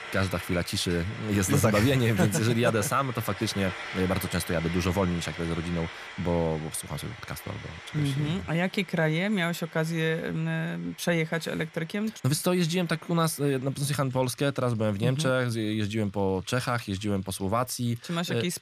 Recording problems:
household noises; noticeable; throughout; 15 dB below the speech

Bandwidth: 14.5 kHz